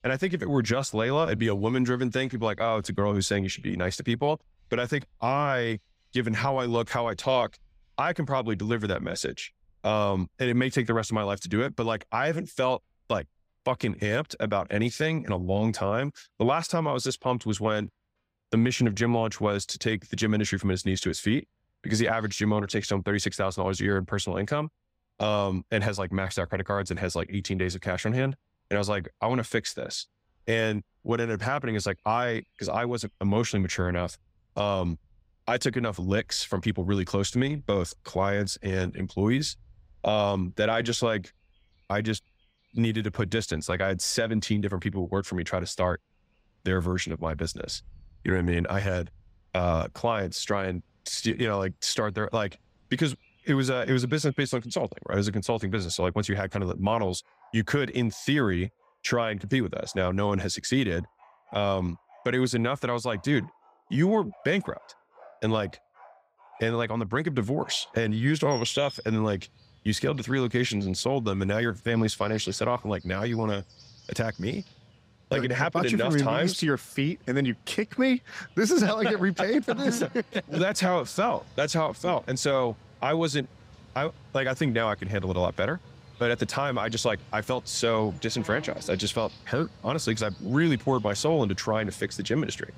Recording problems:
animal sounds; faint; throughout; 25 dB below the speech

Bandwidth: 15.5 kHz